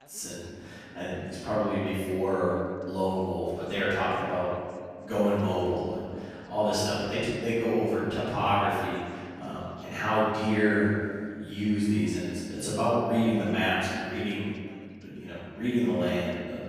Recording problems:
room echo; strong; dies away in 1.8 s
off-mic speech; far
voice in the background; faint; throughout; 30 dB below the speech

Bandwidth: 14.5 kHz